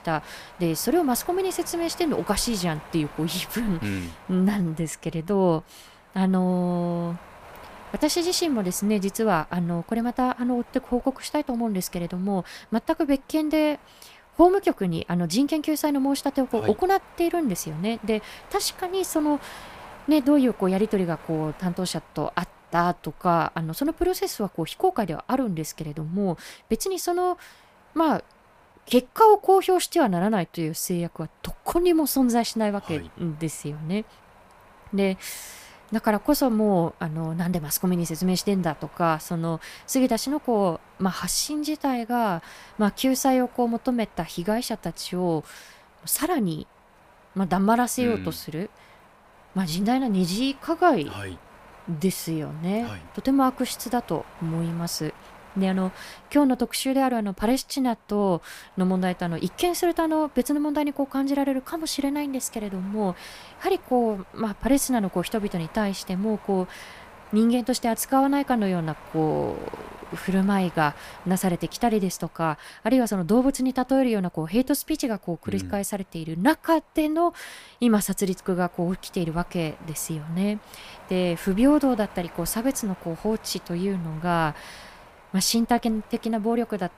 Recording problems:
wind noise on the microphone; occasional gusts; 20 dB below the speech

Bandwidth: 15 kHz